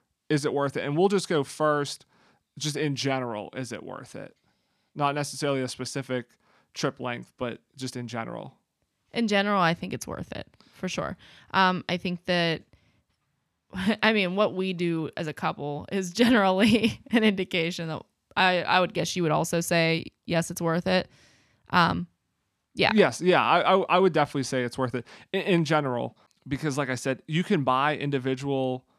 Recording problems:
none

